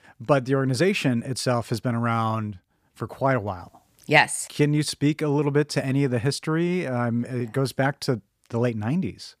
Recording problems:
none

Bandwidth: 15 kHz